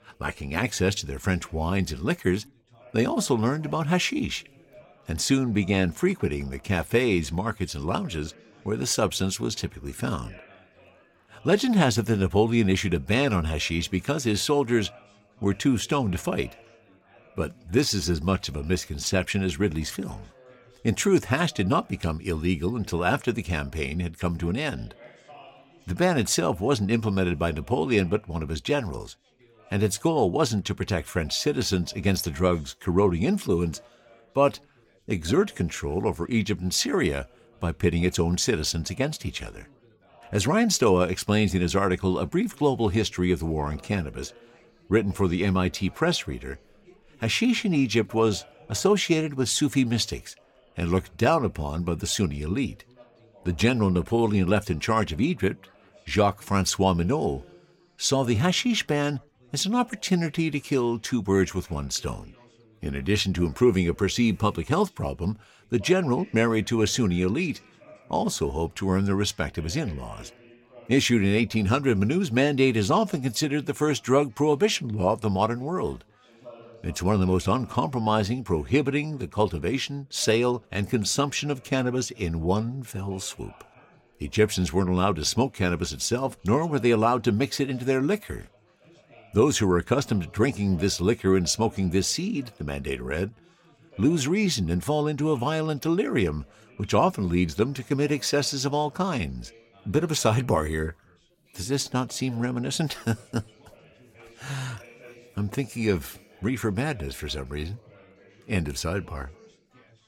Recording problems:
chatter from many people; faint; throughout; 30 dB below the speech

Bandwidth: 16.5 kHz